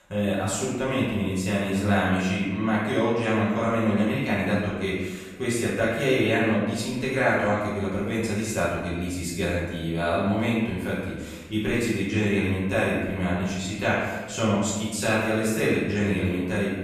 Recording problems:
off-mic speech; far
room echo; noticeable; dies away in 1.1 s

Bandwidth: 14 kHz